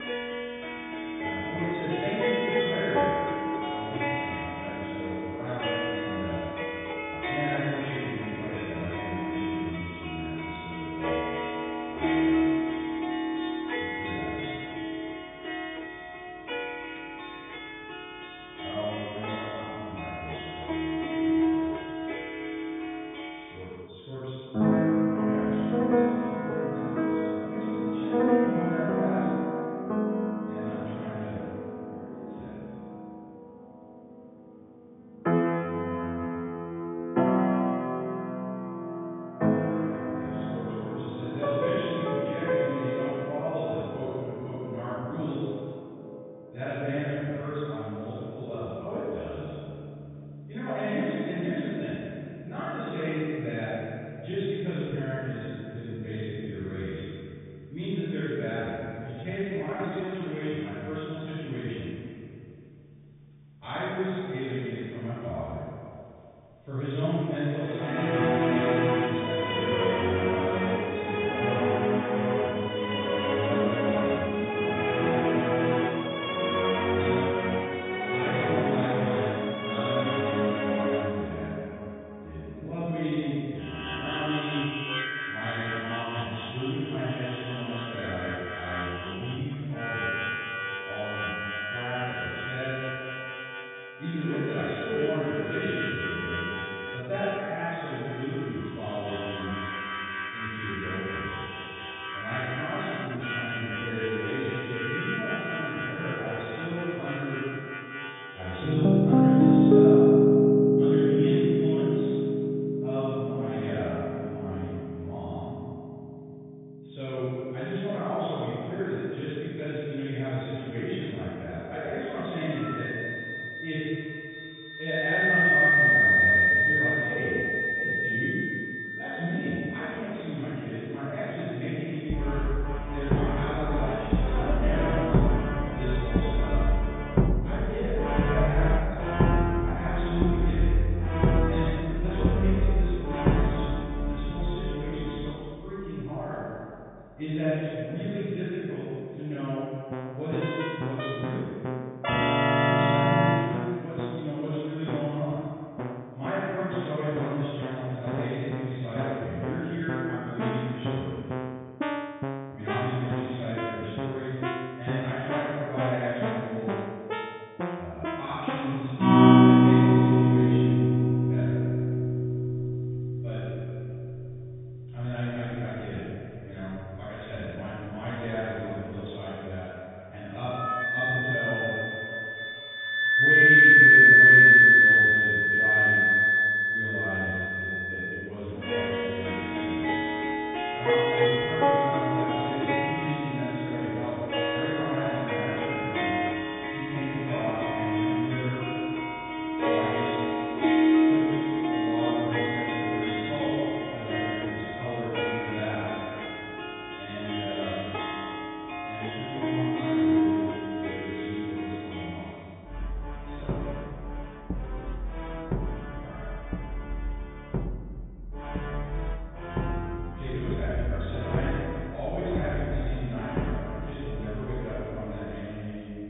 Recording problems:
room echo; strong; dies away in 2.3 s
off-mic speech; far
high frequencies cut off; severe; nothing above 3.5 kHz
background music; very loud; throughout; 8 dB above the speech
uneven, jittery; strongly; from 8.5 s to 3:41

